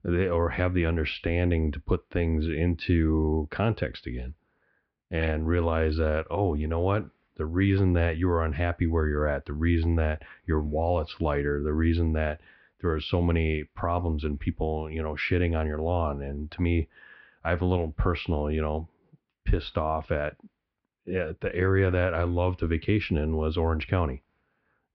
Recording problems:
muffled; very; fading above 2.5 kHz
high frequencies cut off; noticeable; nothing above 5.5 kHz

